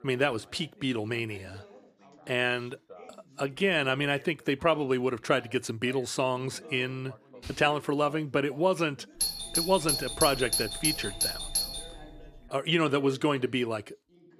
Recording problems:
background chatter; faint; throughout; 3 voices, 25 dB below the speech
doorbell; loud; from 9 to 12 s; peak 2 dB above the speech

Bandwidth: 14.5 kHz